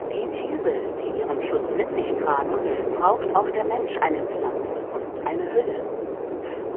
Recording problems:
phone-call audio; poor line; nothing above 3 kHz
wind noise on the microphone; heavy; 3 dB below the speech

